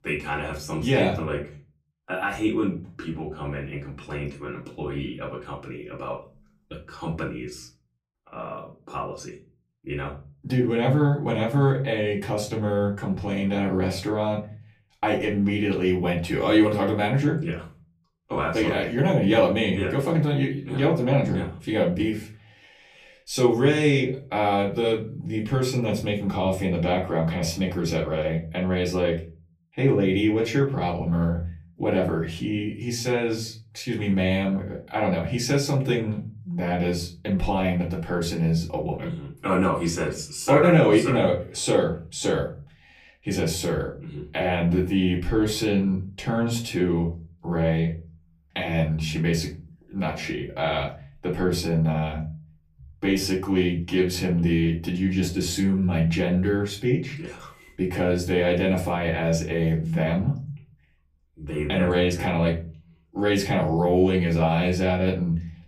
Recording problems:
off-mic speech; far
room echo; very slight; dies away in 0.4 s

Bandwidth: 15 kHz